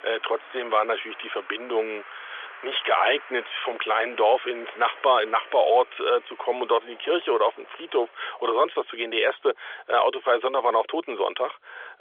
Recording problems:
phone-call audio; nothing above 3.5 kHz
traffic noise; noticeable; throughout; 20 dB below the speech

